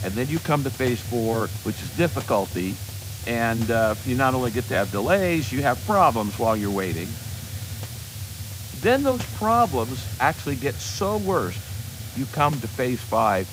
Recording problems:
hiss; loud; throughout; 9 dB below the speech

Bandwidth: 15.5 kHz